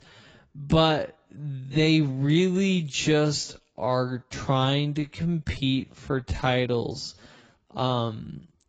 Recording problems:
garbled, watery; badly; nothing above 7.5 kHz
wrong speed, natural pitch; too slow; 0.6 times normal speed

